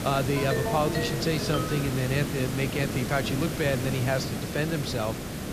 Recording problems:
hiss; loud; throughout; 3 dB below the speech
phone ringing; noticeable; until 2 s; peak 2 dB below the speech

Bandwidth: 14.5 kHz